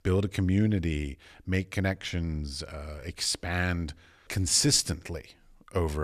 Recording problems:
abrupt cut into speech; at the end

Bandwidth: 14.5 kHz